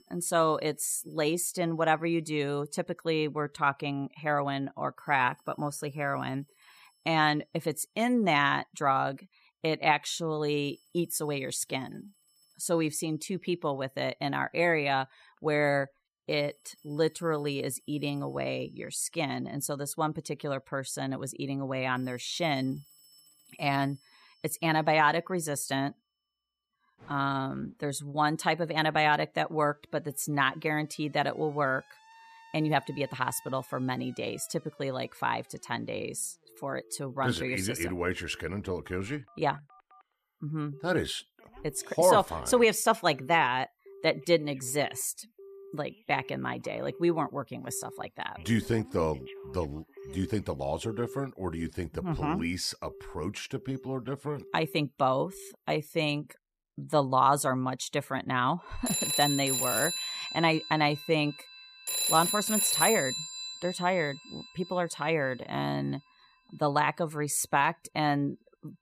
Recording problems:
alarms or sirens; loud; throughout; 4 dB below the speech

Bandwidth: 14.5 kHz